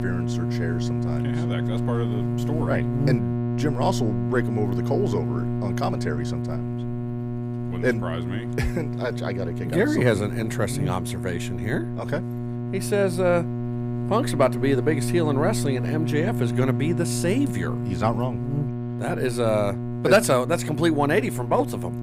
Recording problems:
electrical hum; loud; throughout; 60 Hz, 8 dB below the speech

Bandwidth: 15.5 kHz